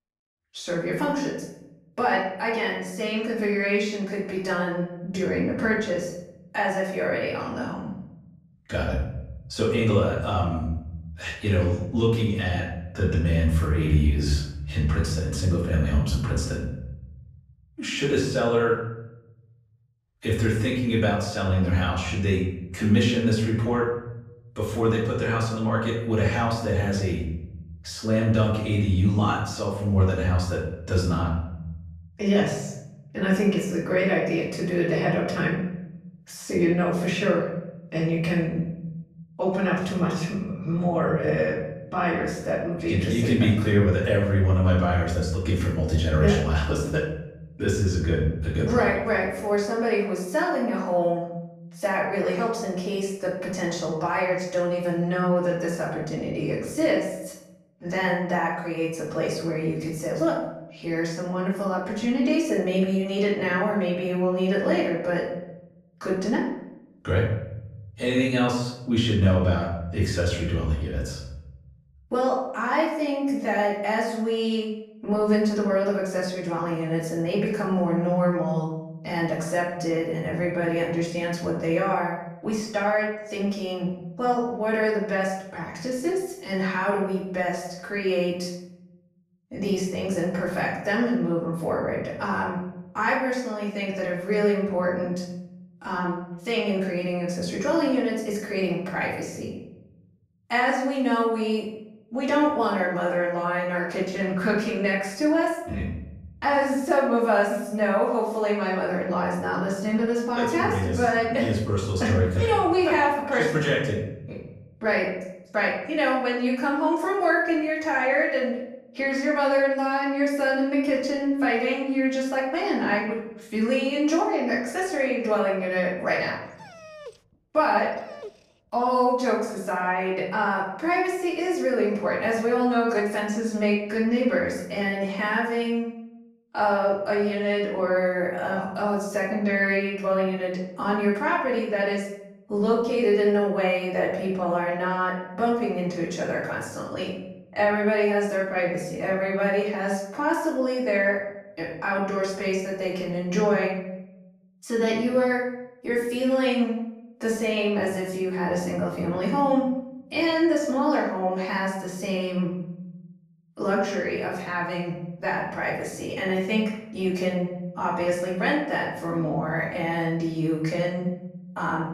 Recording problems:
off-mic speech; far
room echo; noticeable; dies away in 0.9 s
dog barking; faint; from 2:07 to 2:08; peak 15 dB below the speech

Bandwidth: 15.5 kHz